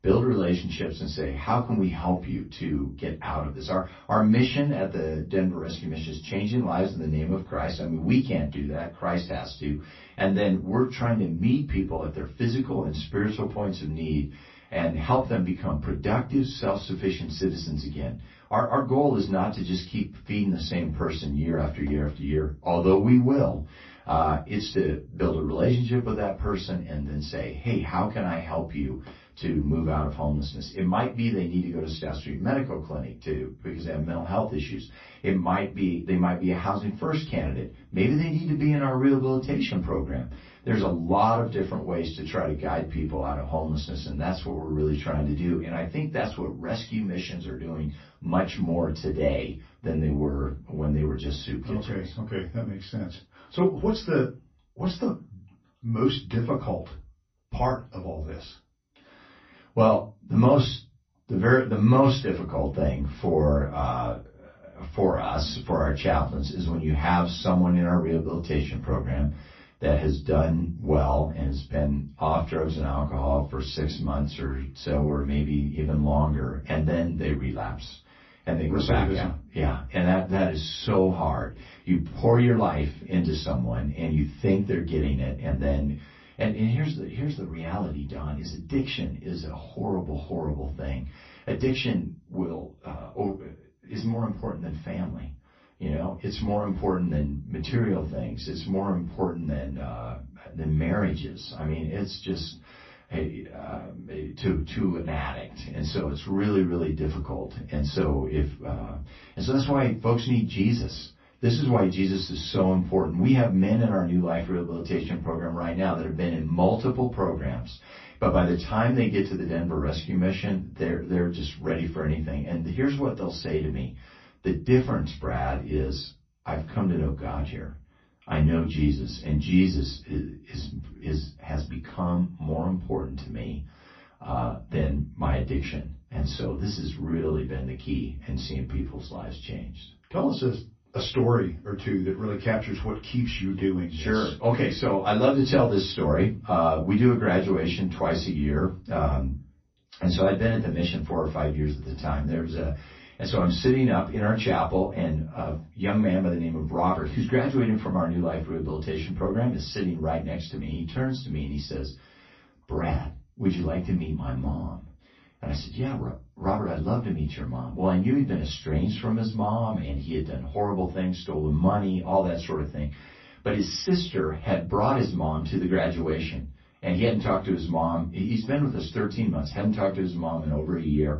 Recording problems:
off-mic speech; far
room echo; very slight; dies away in 0.2 s
garbled, watery; slightly; nothing above 5.5 kHz

